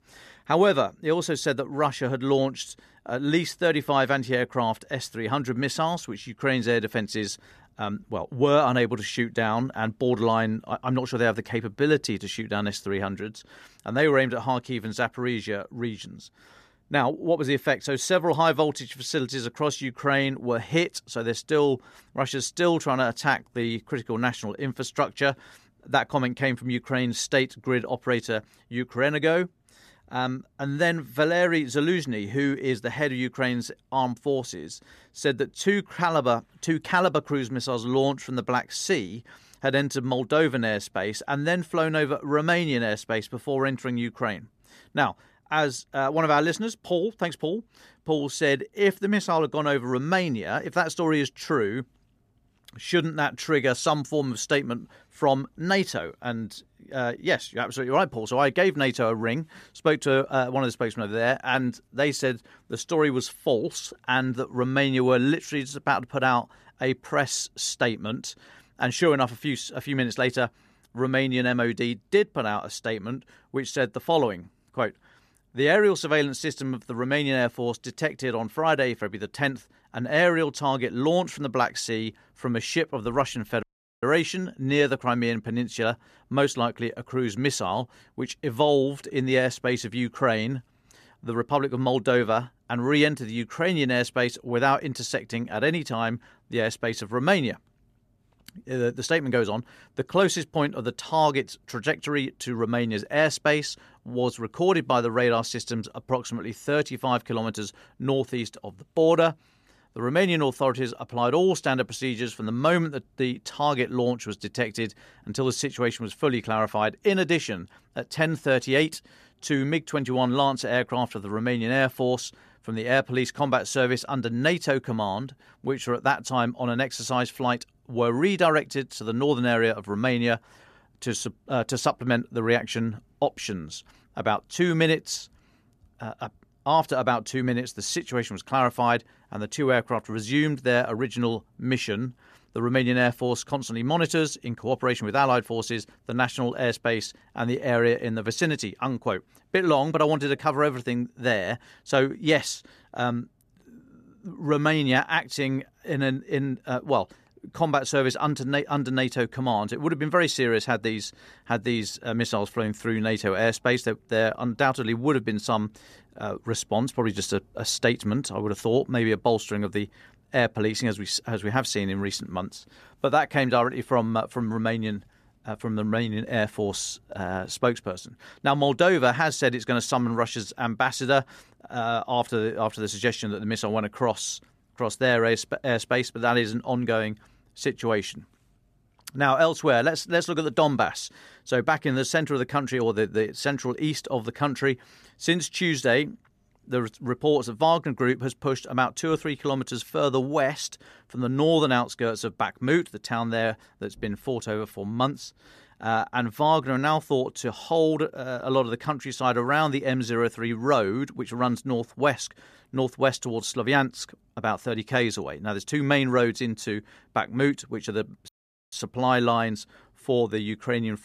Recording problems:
audio cutting out; at 1:24 and at 3:38

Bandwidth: 14.5 kHz